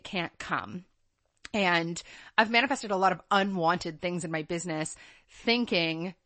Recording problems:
garbled, watery; slightly; nothing above 8 kHz

